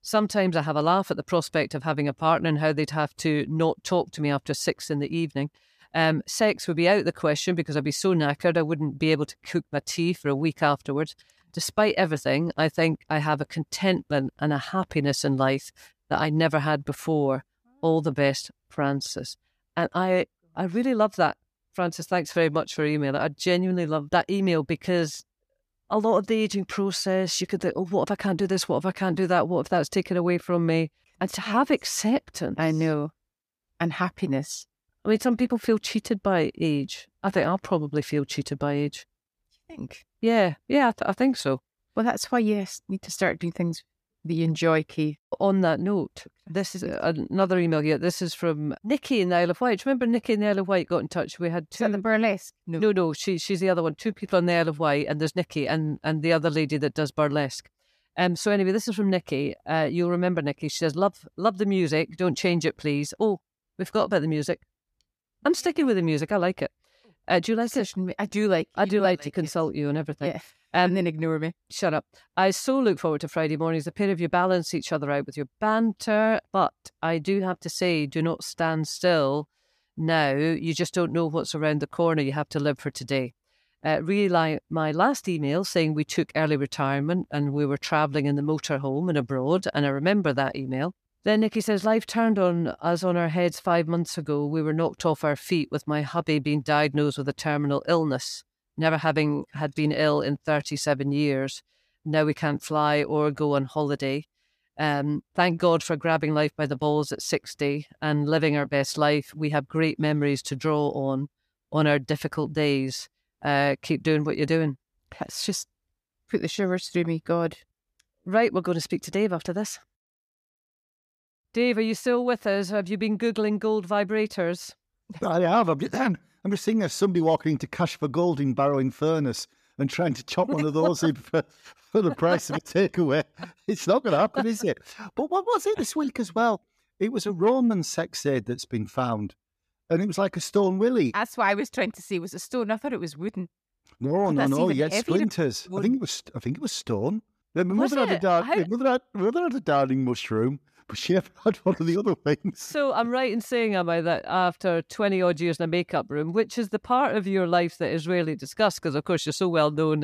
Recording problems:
abrupt cut into speech; at the end

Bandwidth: 14.5 kHz